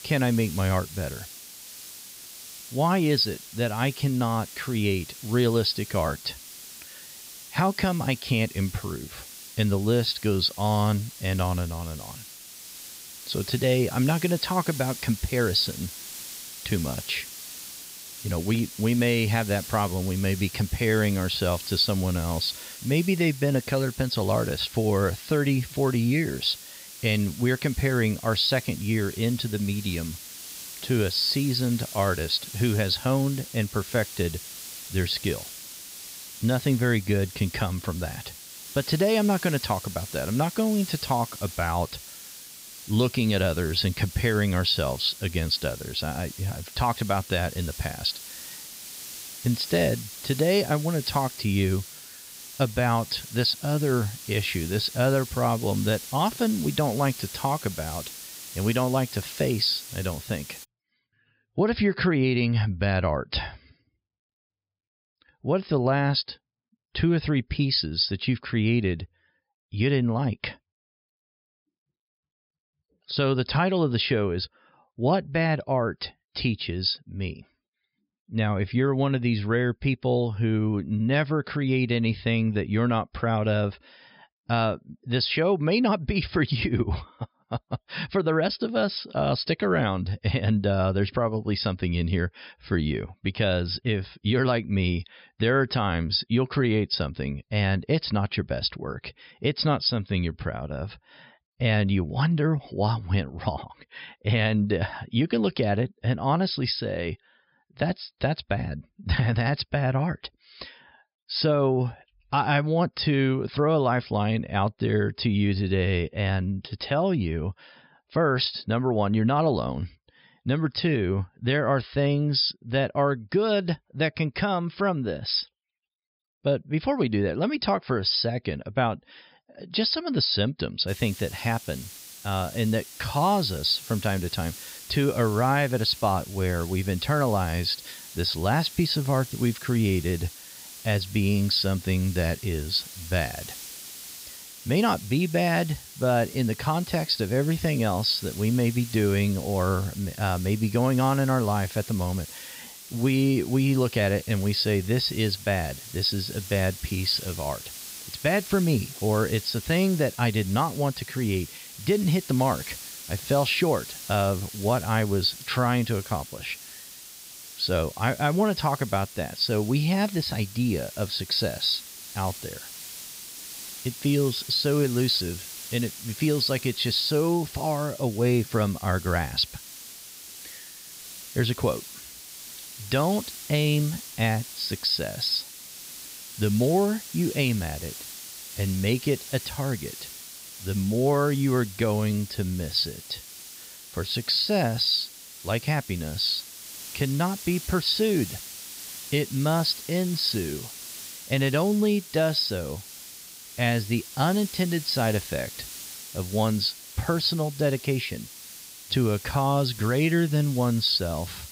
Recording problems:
high frequencies cut off; noticeable; nothing above 5.5 kHz
hiss; noticeable; until 1:01 and from 2:11 on; 15 dB below the speech

